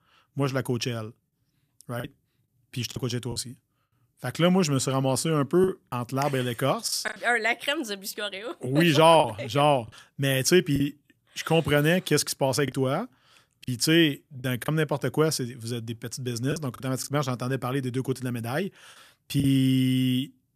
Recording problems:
choppy; occasionally; 4% of the speech affected

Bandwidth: 14.5 kHz